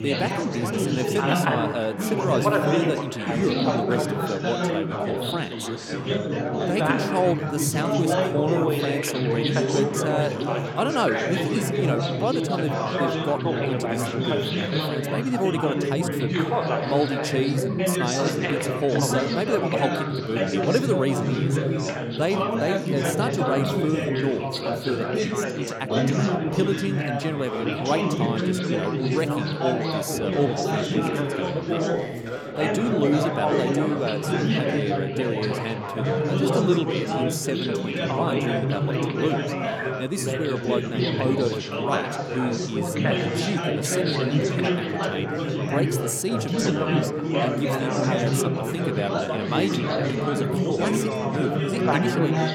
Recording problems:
chatter from many people; very loud; throughout; 3 dB above the speech

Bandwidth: 17 kHz